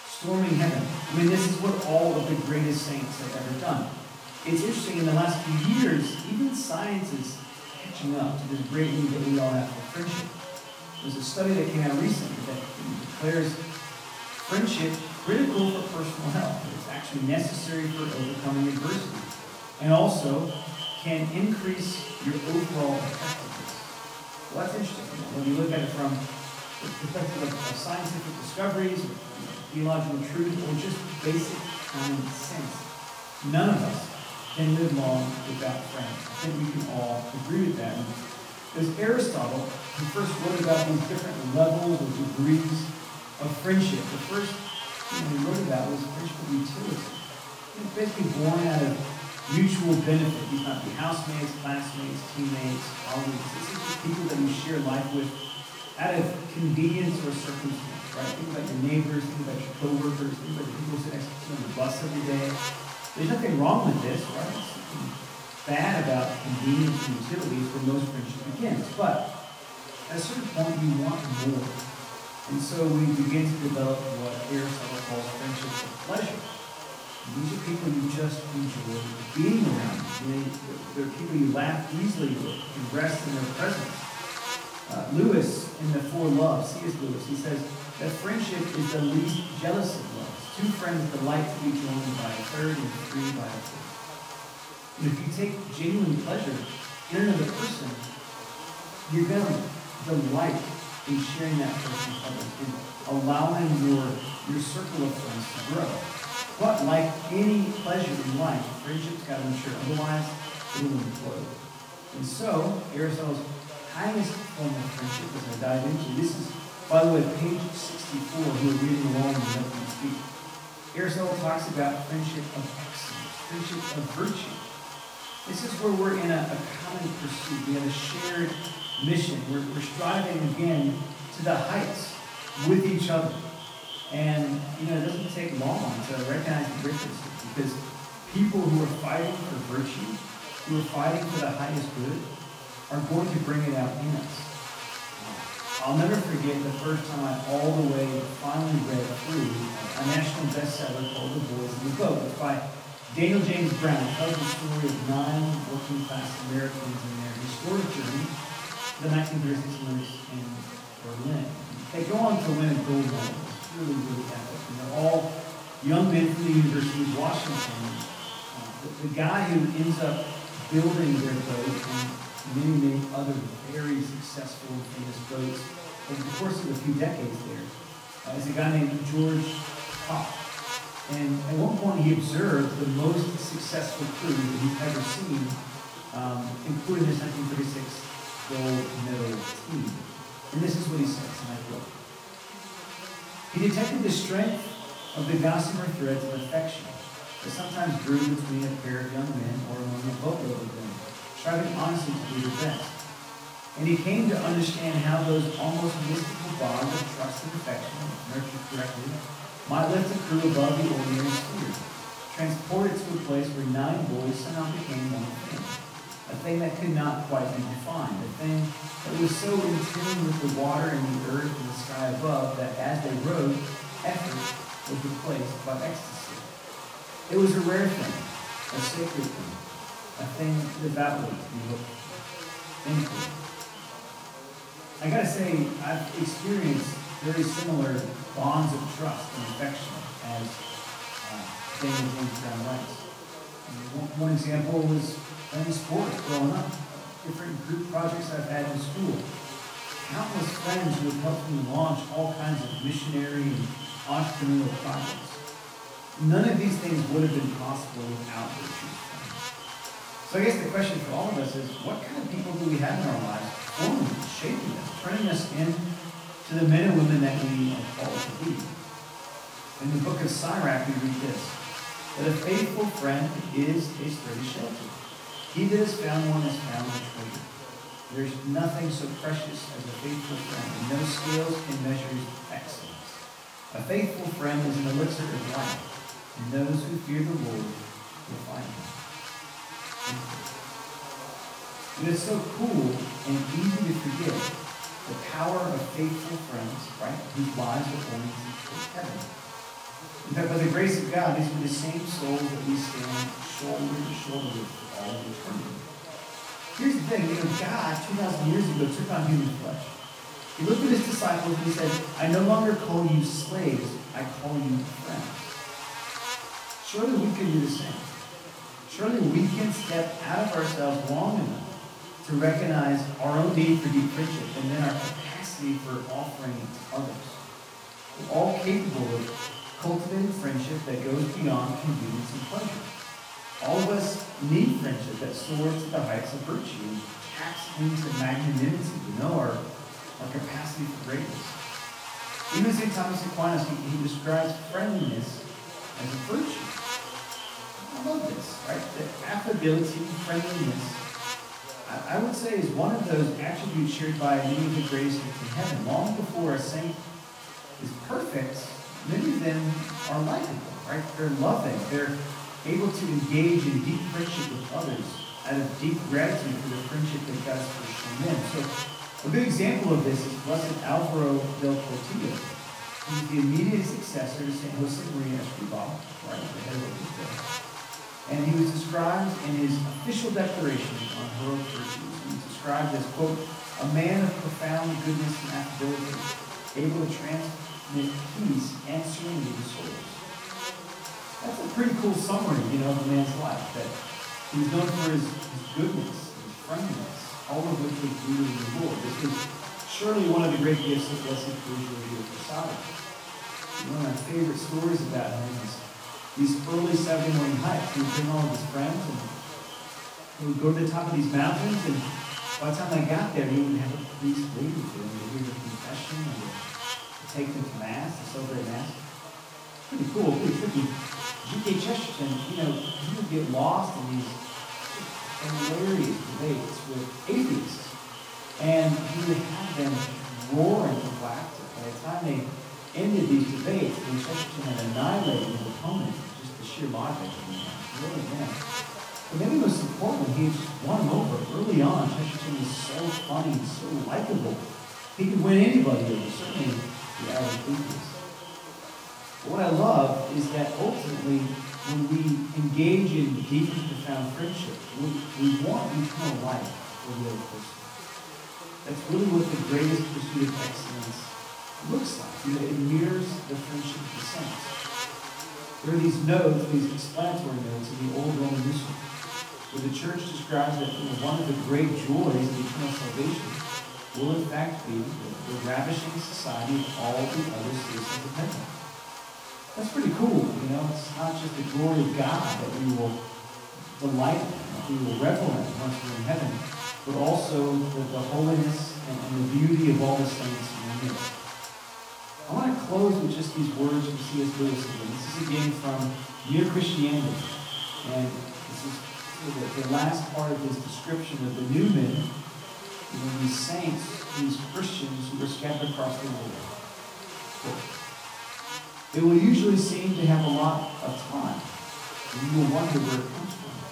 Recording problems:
off-mic speech; far
echo of what is said; noticeable; throughout; 280 ms later, 15 dB below the speech
room echo; noticeable; dies away in 0.6 s
electrical hum; loud; throughout; 50 Hz, 7 dB below the speech
voice in the background; faint; throughout; 20 dB below the speech

